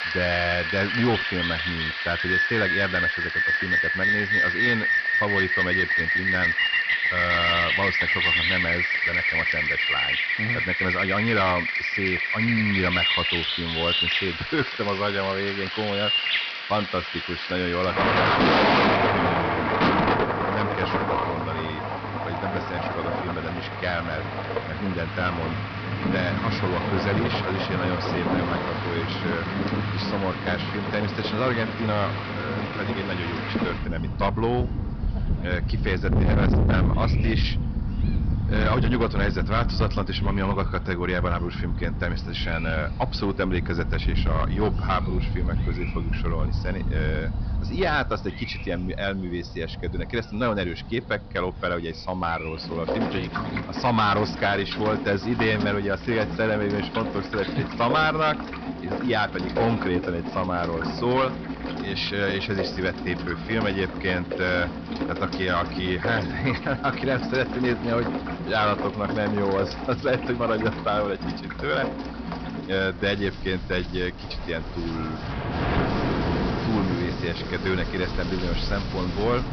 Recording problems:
distortion; heavy; 8% of the sound clipped
high frequencies cut off; noticeable; nothing above 5.5 kHz
rain or running water; very loud; throughout; 1 dB above the speech

